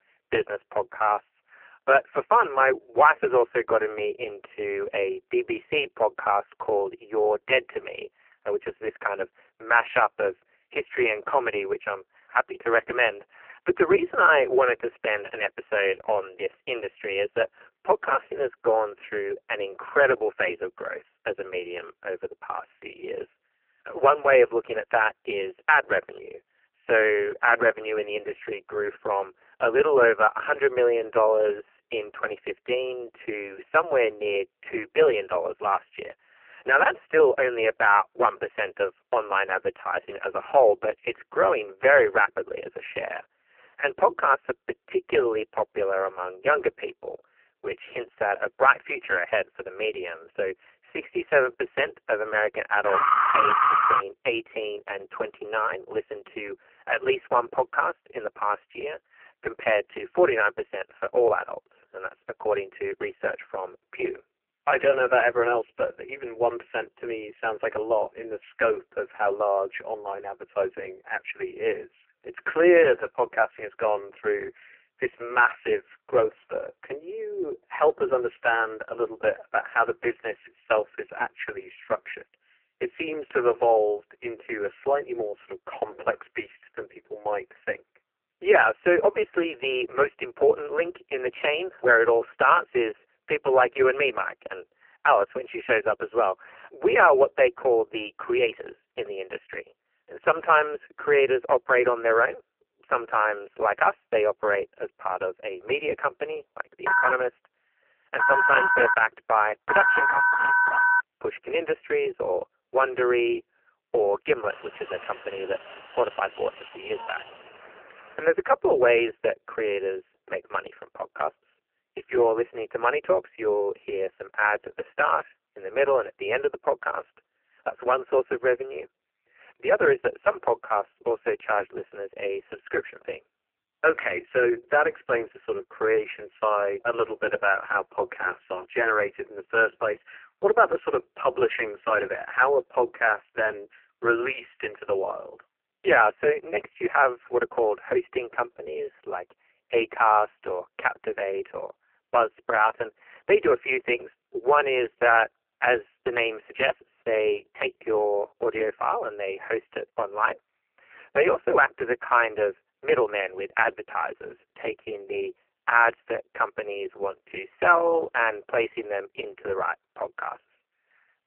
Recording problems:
phone-call audio; poor line; nothing above 3 kHz
thin; very; fading below 300 Hz
alarm; loud; from 53 to 54 s; peak 7 dB above the speech
phone ringing; loud; from 1:47 to 1:51; peak 6 dB above the speech
alarm; faint; from 1:54 to 1:58; peak 15 dB below the speech

